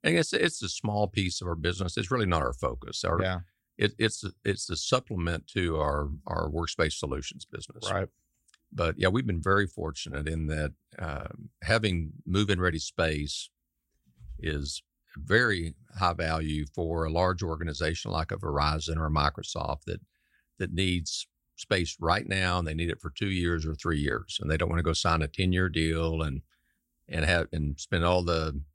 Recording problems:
none

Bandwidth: 16 kHz